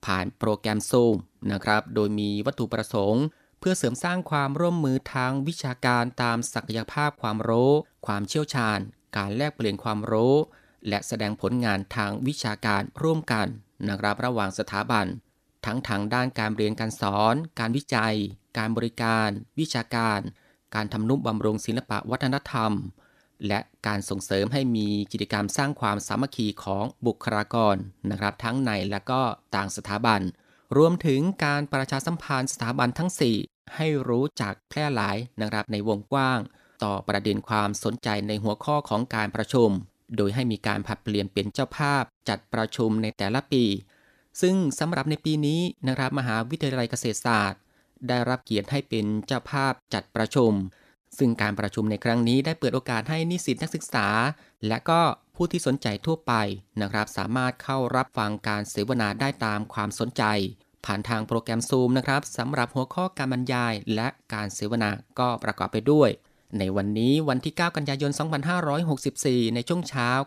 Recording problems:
none

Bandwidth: 14.5 kHz